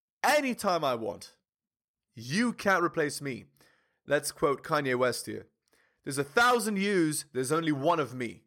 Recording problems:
none

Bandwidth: 17 kHz